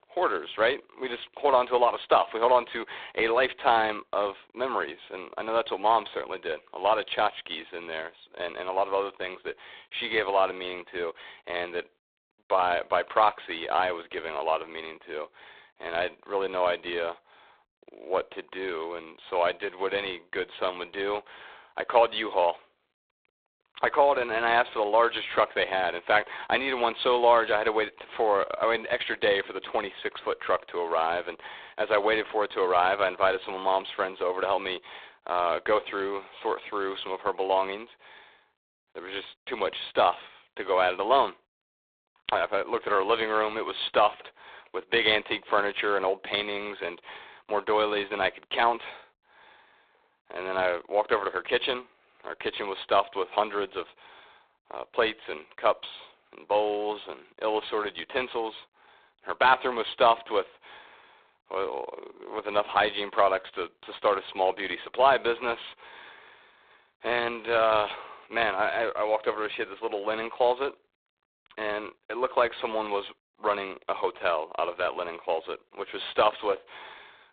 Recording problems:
phone-call audio; poor line; nothing above 3.5 kHz
thin; very; fading below 450 Hz

